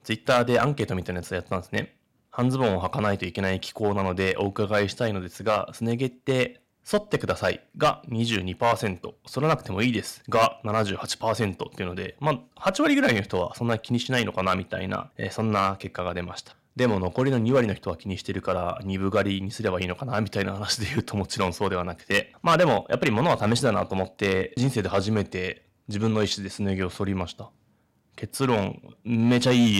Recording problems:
distortion; slight; 2% of the sound clipped
abrupt cut into speech; at the end

